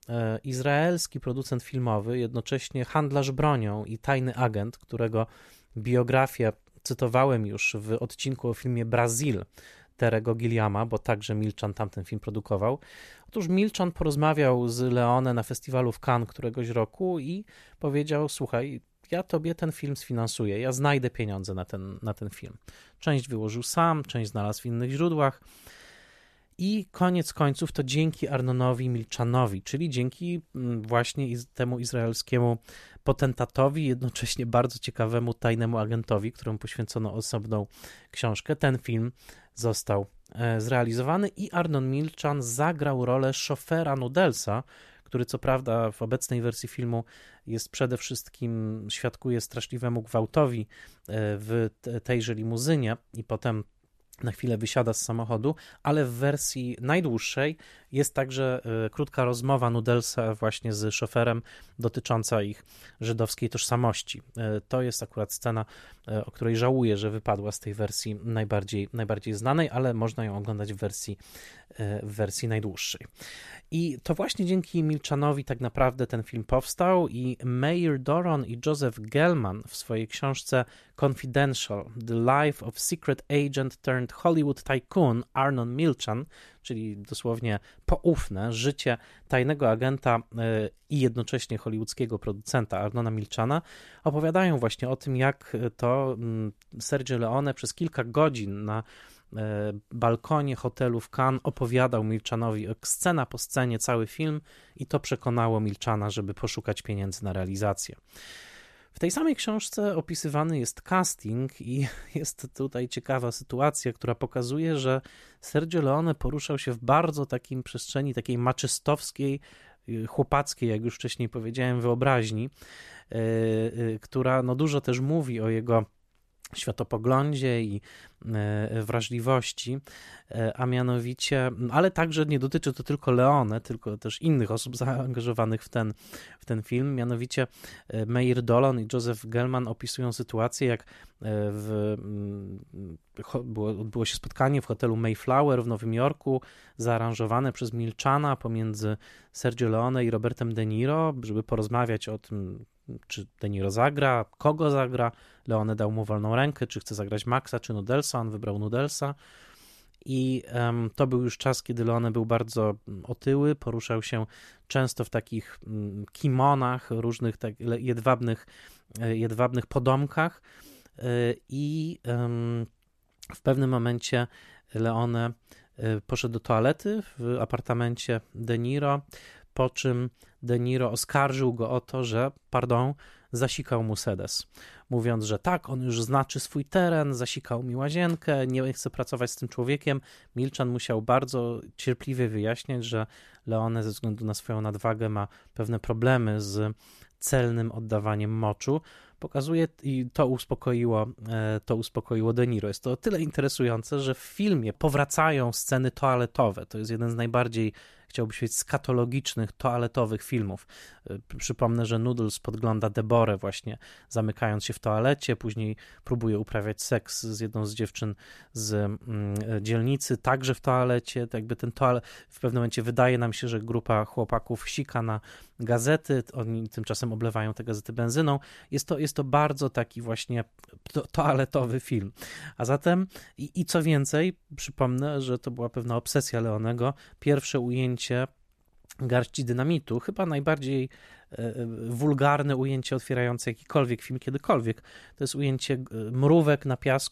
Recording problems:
none

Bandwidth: 14 kHz